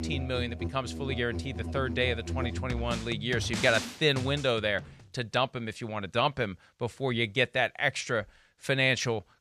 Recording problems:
background music; loud; until 4.5 s; 7 dB below the speech

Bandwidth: 13.5 kHz